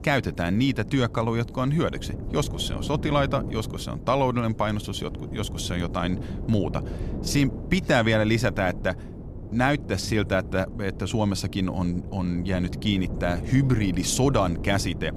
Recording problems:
wind noise on the microphone; occasional gusts; 15 dB below the speech

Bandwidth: 14 kHz